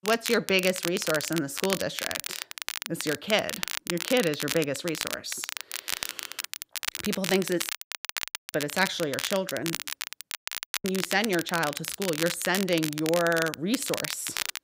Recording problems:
crackle, like an old record; loud; 5 dB below the speech
audio cutting out; at 7.5 s for 1 s and at 10 s for 0.5 s

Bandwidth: 15.5 kHz